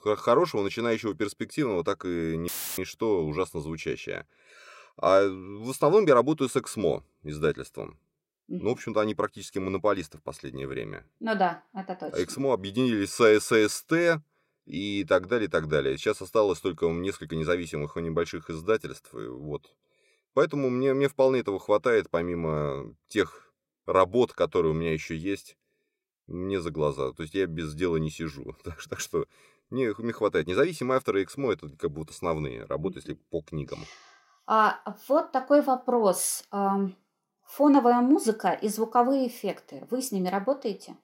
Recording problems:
audio cutting out; filled with static; at 2.5 s

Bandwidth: 16 kHz